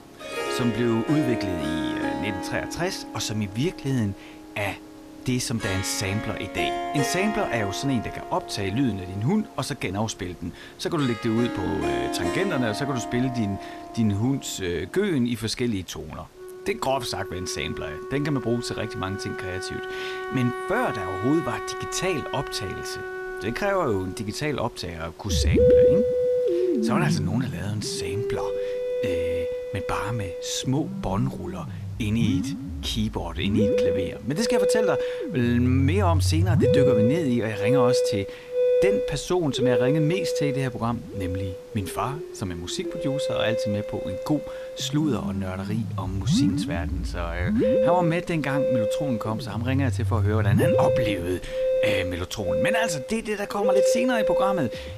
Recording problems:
background music; very loud; throughout; 1 dB above the speech
hiss; faint; throughout; 25 dB below the speech
uneven, jittery; strongly; from 13 to 54 s

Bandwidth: 14.5 kHz